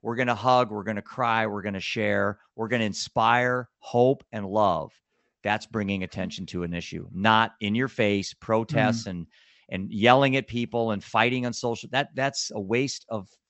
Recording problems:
high frequencies cut off; noticeable; nothing above 8 kHz

